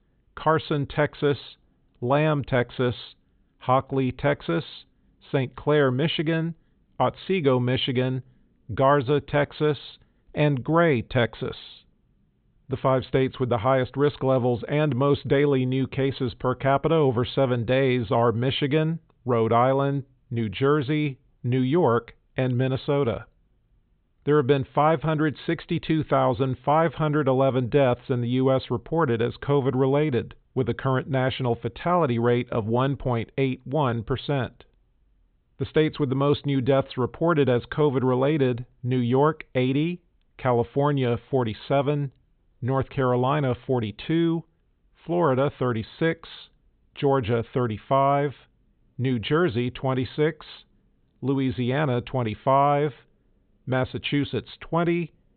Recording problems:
high frequencies cut off; severe; nothing above 4 kHz

